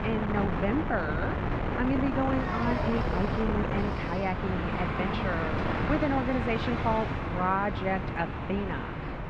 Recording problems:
muffled; slightly; fading above 2 kHz
wind noise on the microphone; heavy; 3 dB below the speech
traffic noise; loud; from 2 s on; 4 dB below the speech

